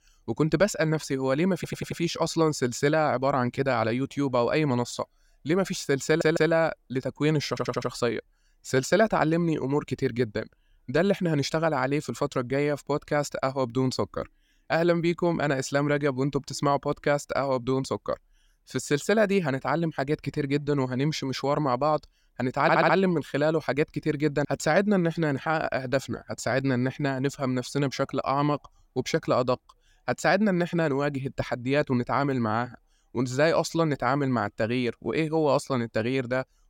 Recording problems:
audio stuttering; 4 times, first at 1.5 s

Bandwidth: 16.5 kHz